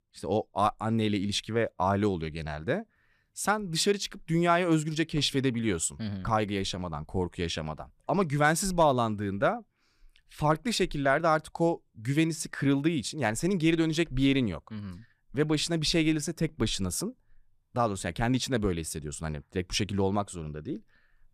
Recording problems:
none

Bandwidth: 14.5 kHz